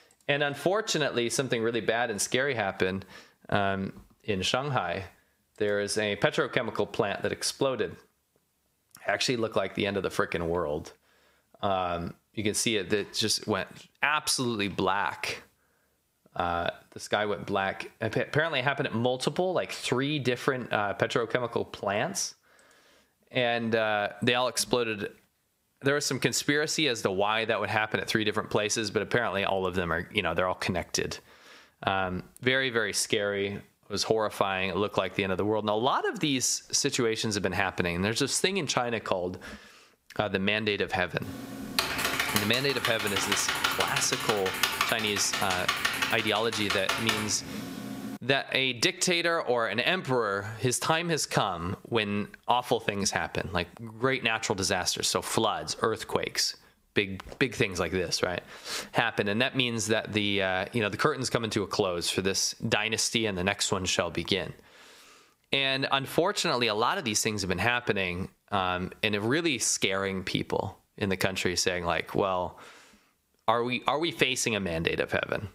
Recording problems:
squashed, flat; heavily
keyboard typing; loud; from 41 to 48 s; peak 2 dB above the speech

